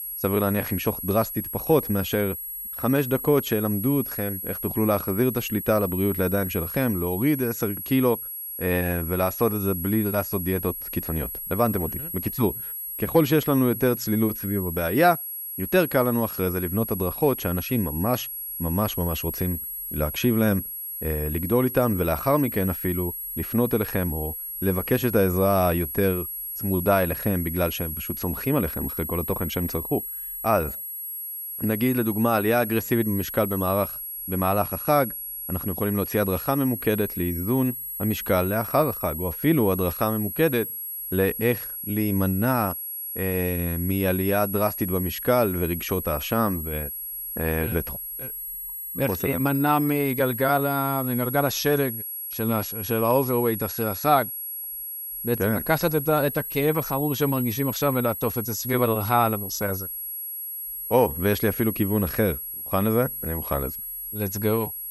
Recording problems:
high-pitched whine; loud; throughout; 11.5 kHz, 6 dB below the speech

